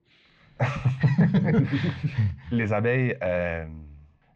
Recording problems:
muffled; slightly; fading above 4.5 kHz

